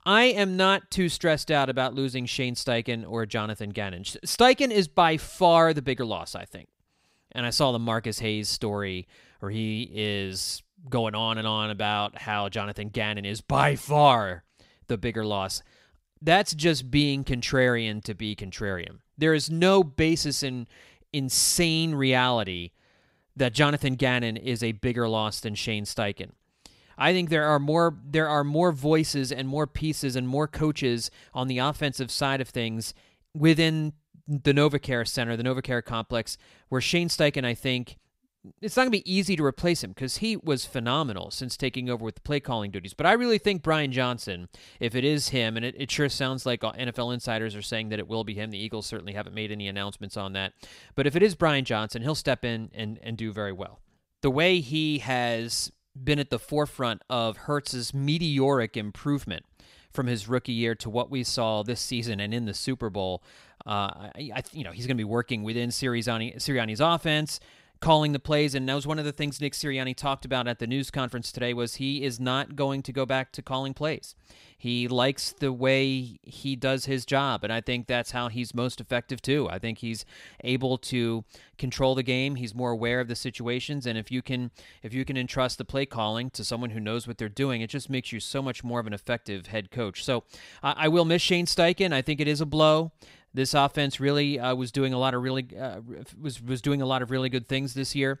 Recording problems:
none

